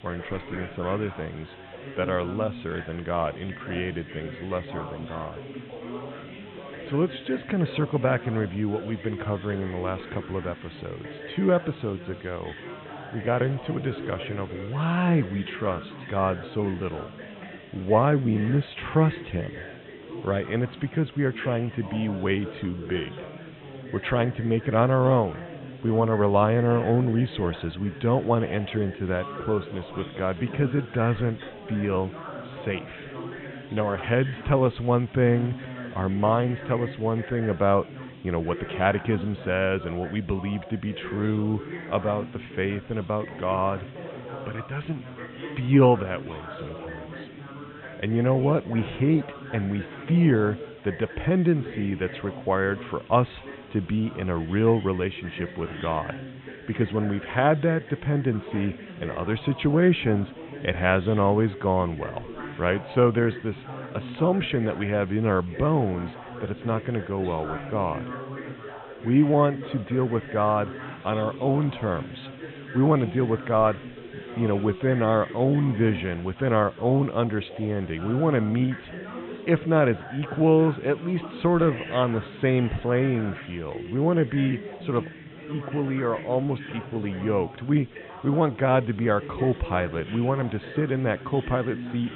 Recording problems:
high frequencies cut off; severe; nothing above 3.5 kHz
chatter from many people; noticeable; throughout; 15 dB below the speech
hiss; faint; throughout; 25 dB below the speech

